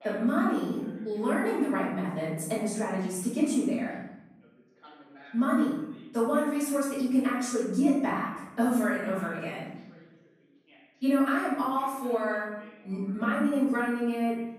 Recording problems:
room echo; strong; dies away in 0.9 s
off-mic speech; far
voice in the background; faint; throughout; 25 dB below the speech

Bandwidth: 14 kHz